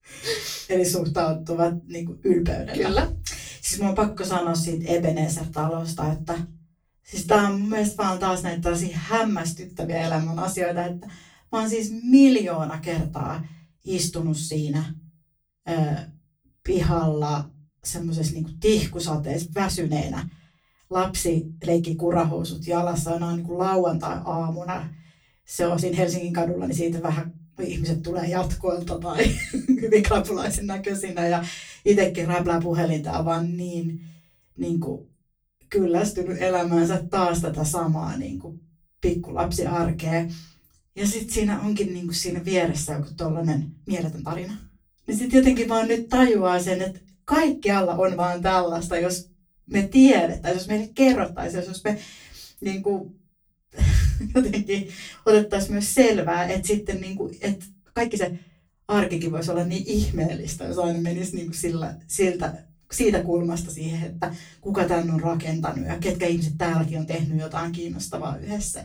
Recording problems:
off-mic speech; far
room echo; very slight; dies away in 0.3 s
uneven, jittery; strongly; from 4 s to 1:07

